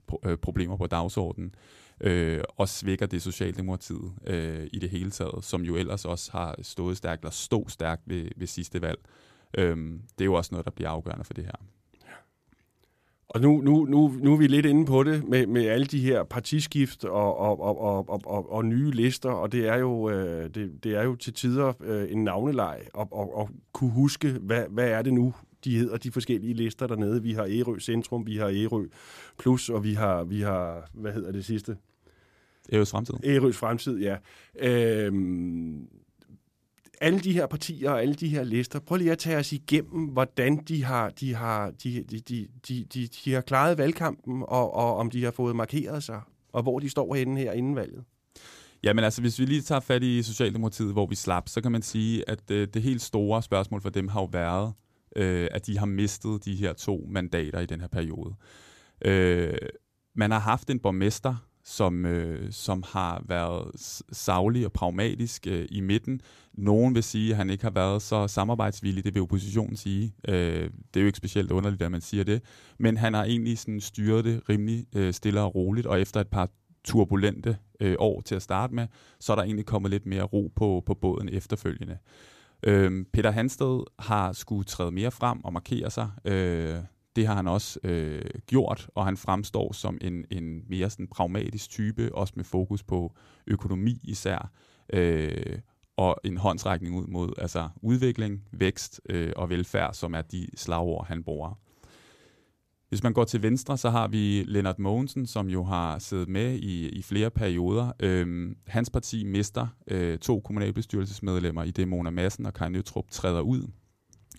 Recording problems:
none

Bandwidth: 14.5 kHz